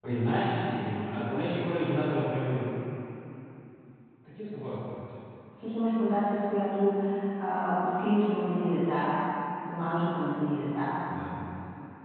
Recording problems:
room echo; strong; dies away in 3 s
off-mic speech; far
high frequencies cut off; severe; nothing above 4 kHz

